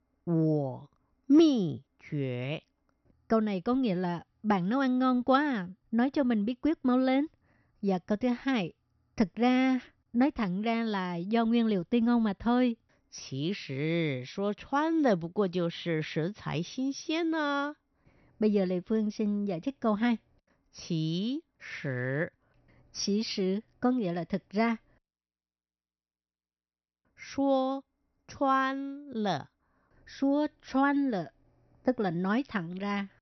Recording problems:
high frequencies cut off; noticeable; nothing above 6 kHz

